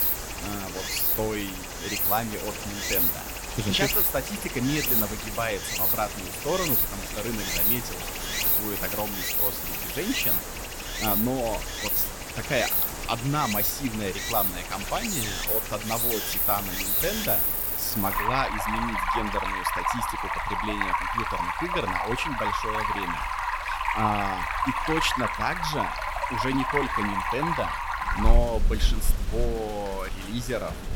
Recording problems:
rain or running water; very loud; throughout; 5 dB above the speech

